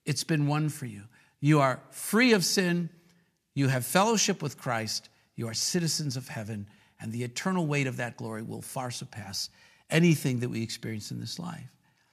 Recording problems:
none

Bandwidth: 14.5 kHz